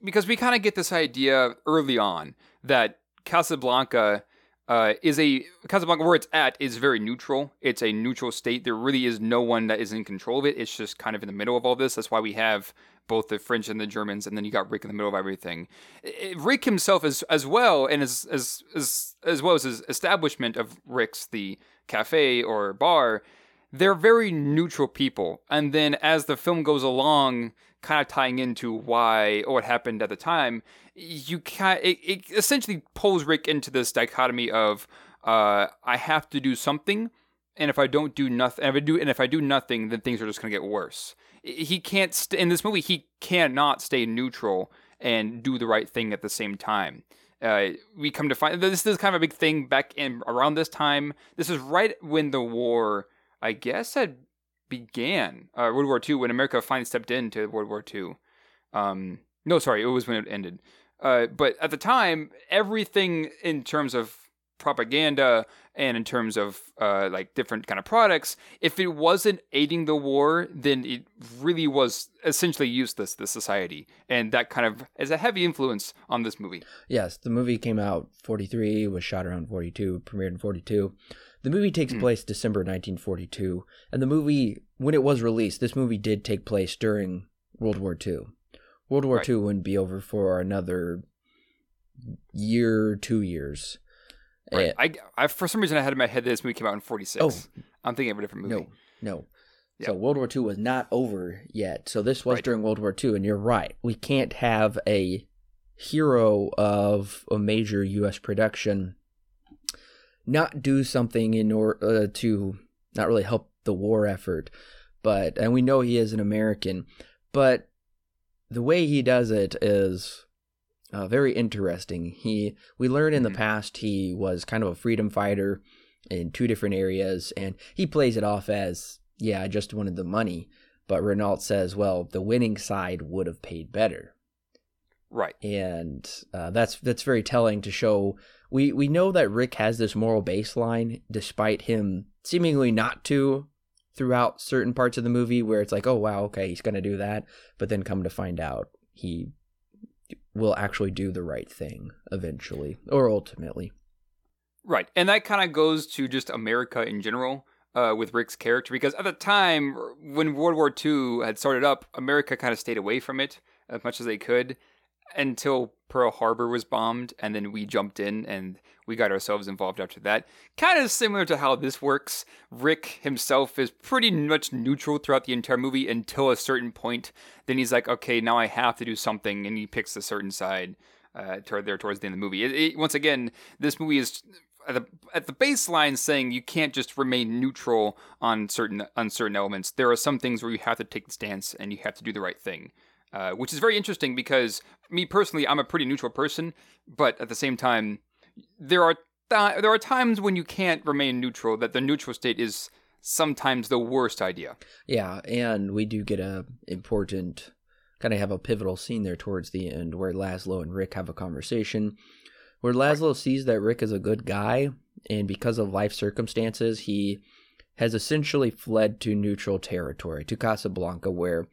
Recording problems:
none

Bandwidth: 17.5 kHz